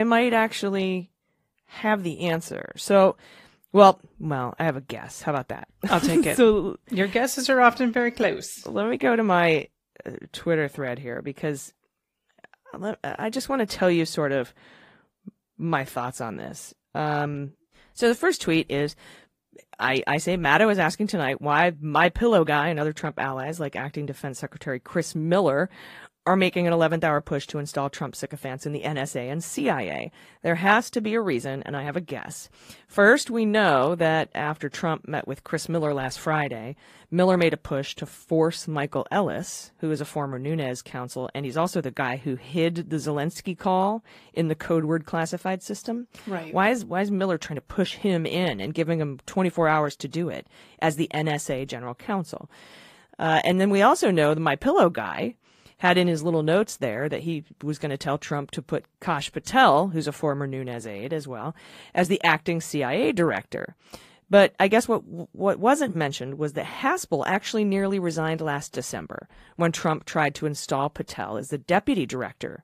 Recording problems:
garbled, watery; slightly; nothing above 15 kHz
abrupt cut into speech; at the start

